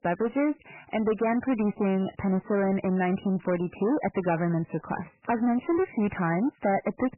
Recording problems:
garbled, watery; badly; nothing above 3 kHz
distortion; slight; 10 dB below the speech

